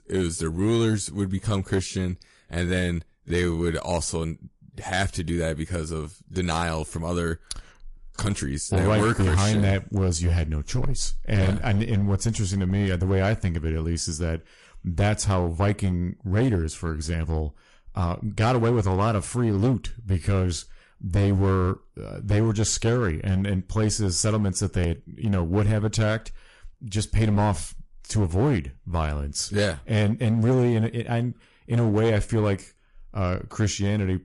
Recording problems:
distortion; slight; 7% of the sound clipped
garbled, watery; slightly; nothing above 11 kHz

